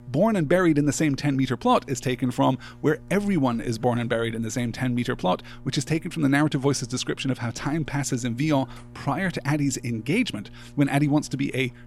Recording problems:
electrical hum; faint; throughout; 60 Hz, 25 dB below the speech

